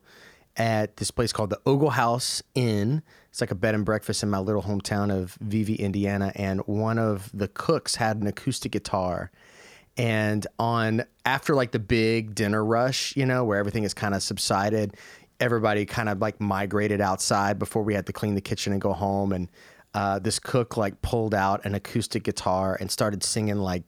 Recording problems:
none

